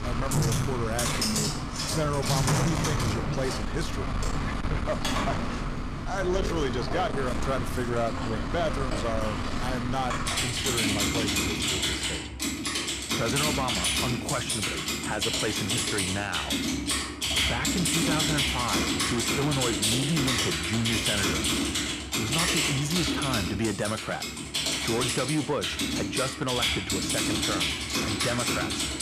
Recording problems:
distortion; slight; 10 dB below the speech
household noises; very loud; throughout; 4 dB above the speech

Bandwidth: 14.5 kHz